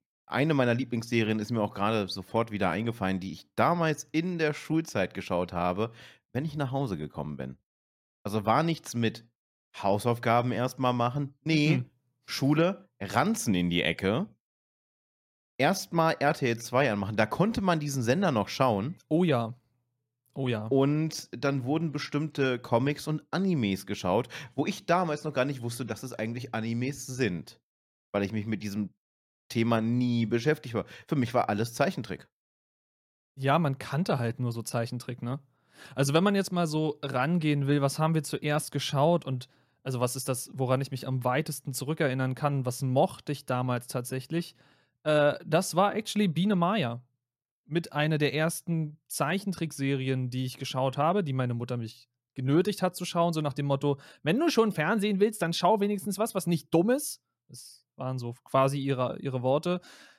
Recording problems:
none

